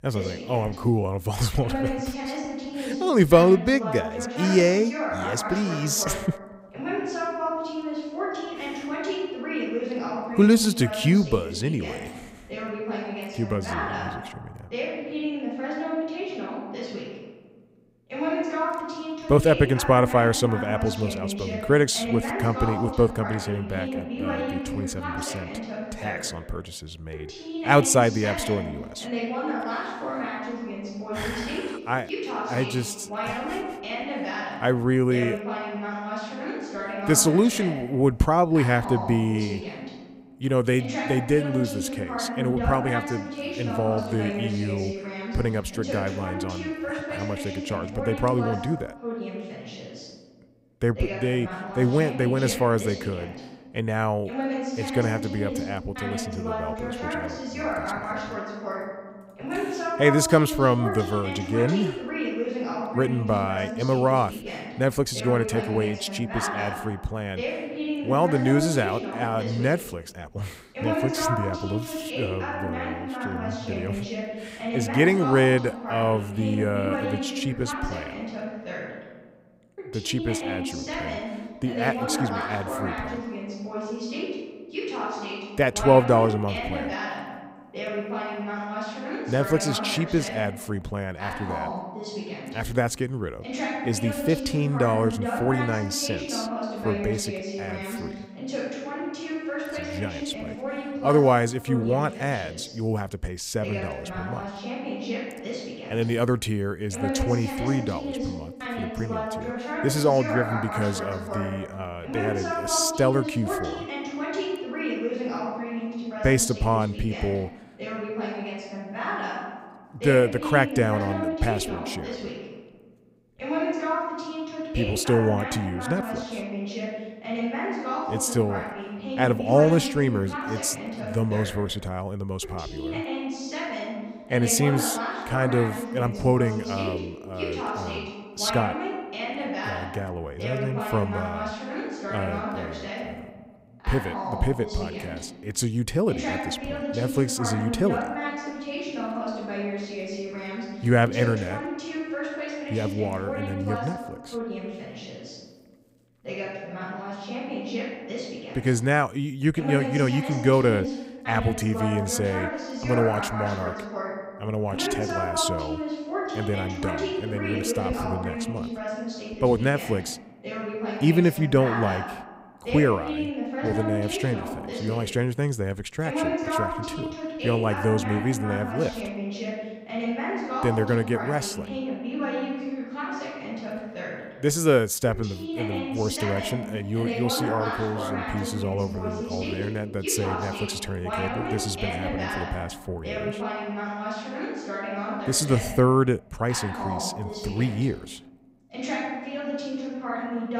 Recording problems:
voice in the background; loud; throughout; 6 dB below the speech

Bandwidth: 15.5 kHz